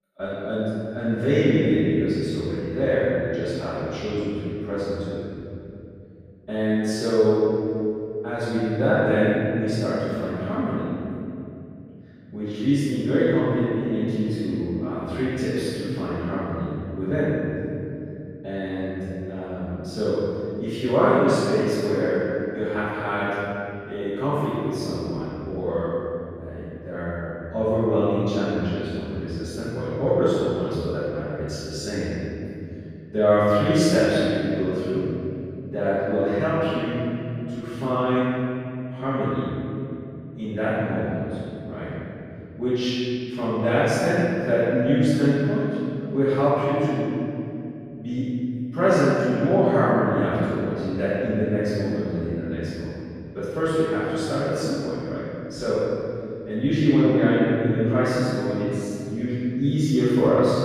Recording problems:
room echo; strong; dies away in 3 s
off-mic speech; far

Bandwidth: 14.5 kHz